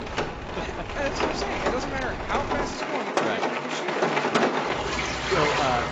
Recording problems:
garbled, watery; badly; nothing above 7.5 kHz
rain or running water; very loud; throughout; 5 dB above the speech
wind noise on the microphone; occasional gusts; until 2.5 s; 20 dB below the speech

